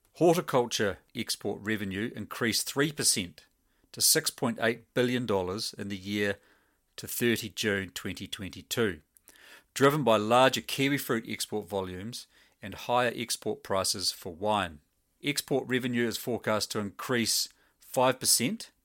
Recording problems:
none

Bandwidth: 16.5 kHz